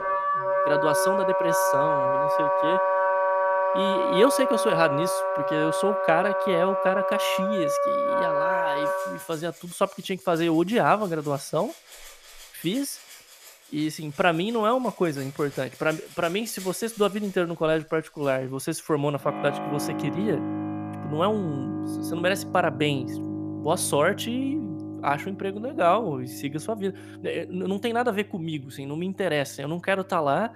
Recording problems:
background music; very loud; throughout; 1 dB above the speech

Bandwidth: 14.5 kHz